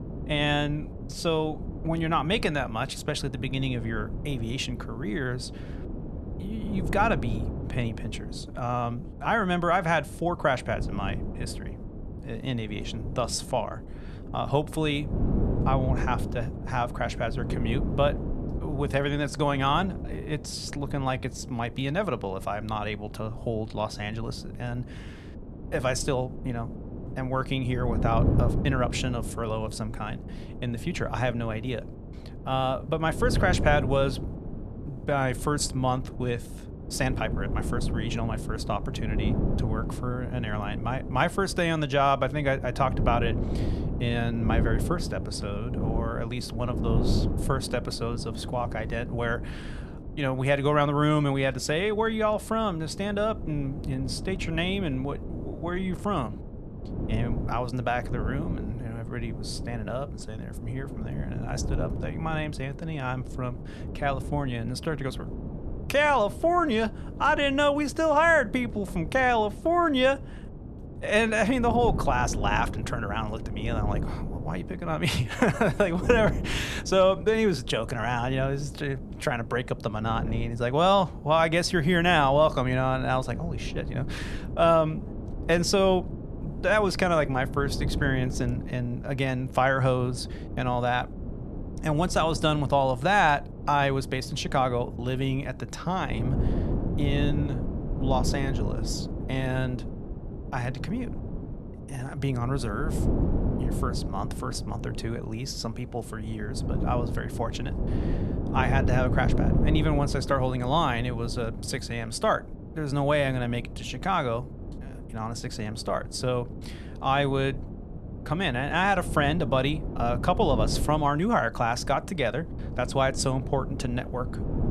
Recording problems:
wind noise on the microphone; occasional gusts; 15 dB below the speech

